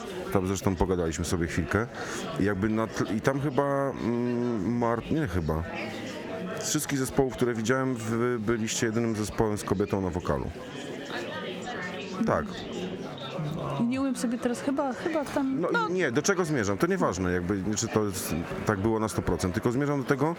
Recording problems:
squashed, flat; heavily, background pumping
murmuring crowd; noticeable; throughout; 10 dB below the speech

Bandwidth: 18.5 kHz